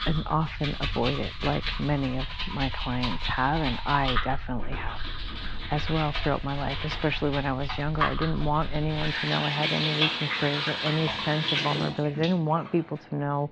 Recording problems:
muffled; slightly; fading above 4 kHz
household noises; loud; throughout; 2 dB below the speech

